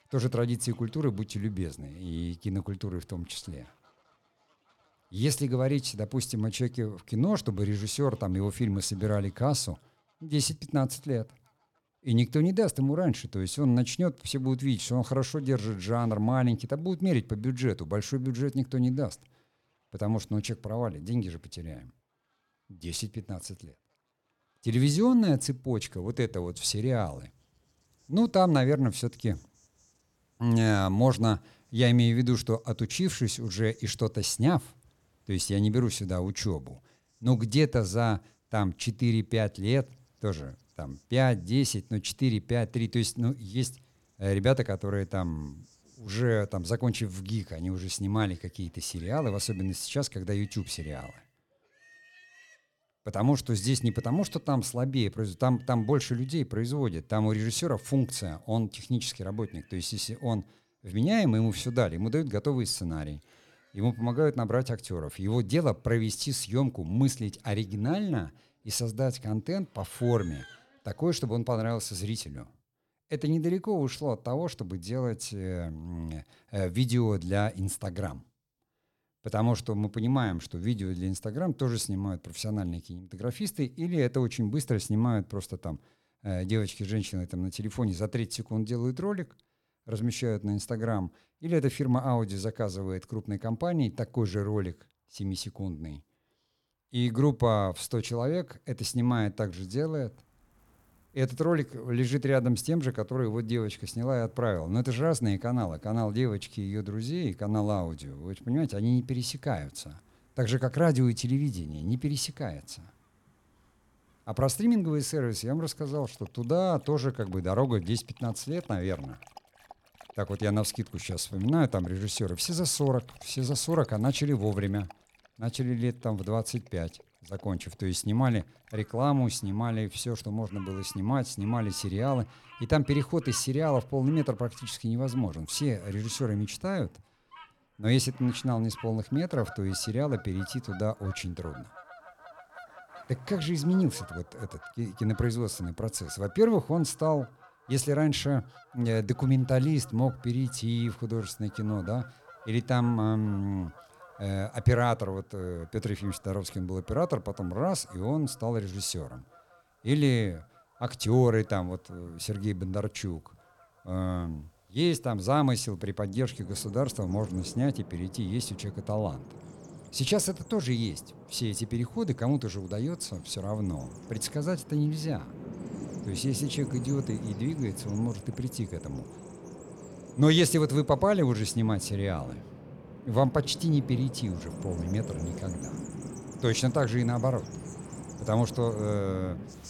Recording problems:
animal sounds; noticeable; throughout; 15 dB below the speech

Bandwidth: 18 kHz